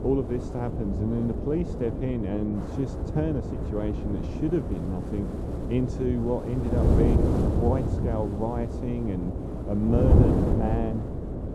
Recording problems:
muffled; very; fading above 1 kHz
wind noise on the microphone; heavy; 2 dB below the speech
electrical hum; noticeable; throughout; 60 Hz, 15 dB below the speech

